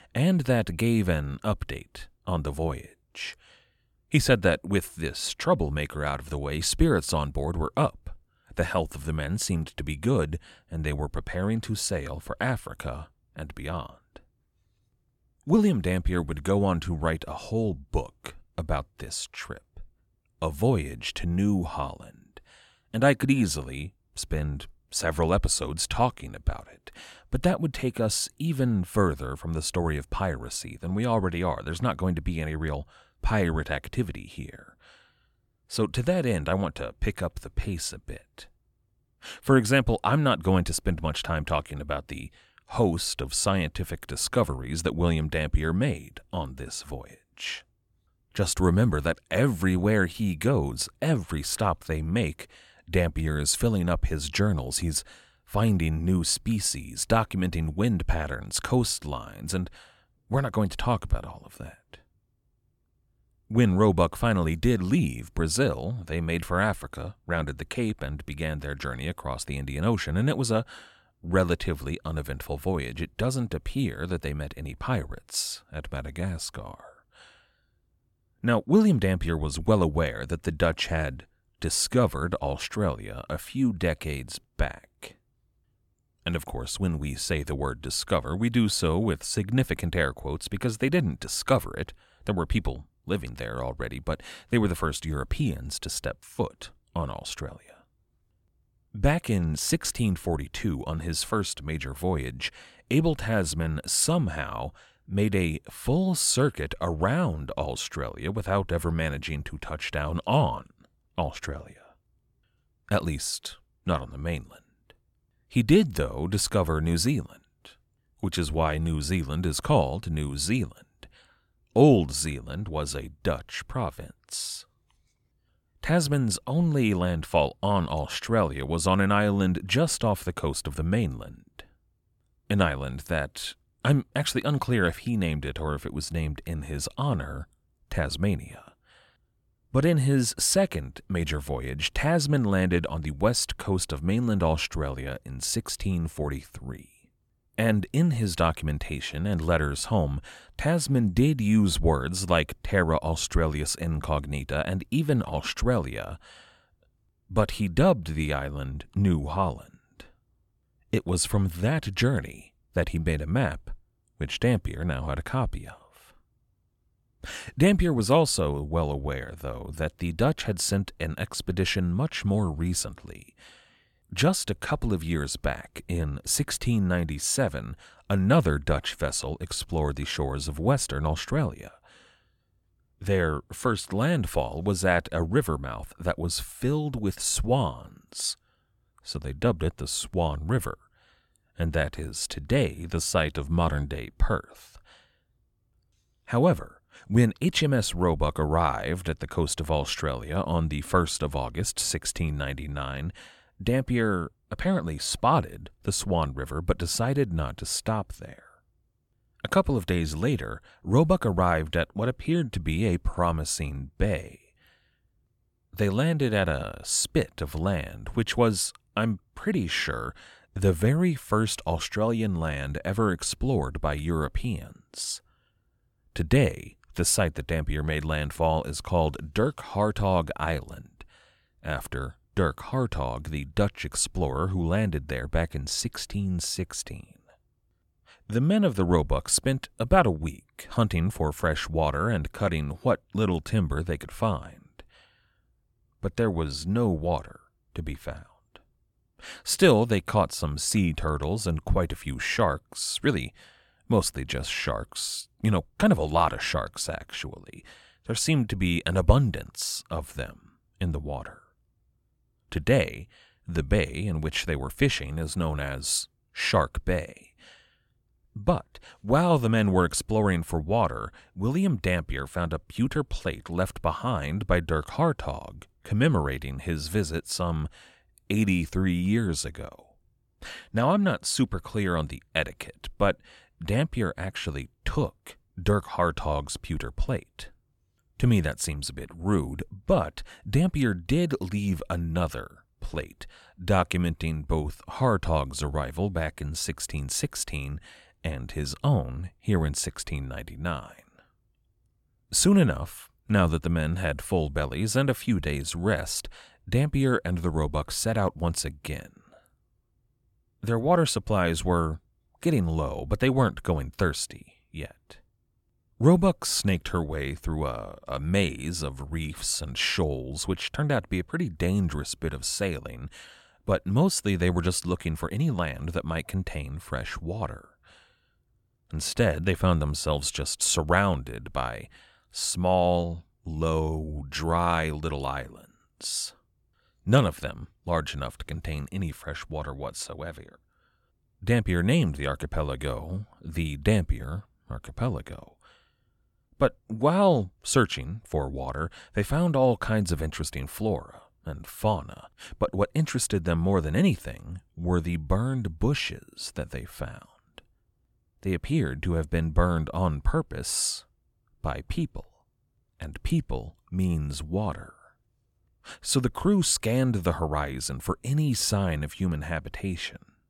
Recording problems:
none

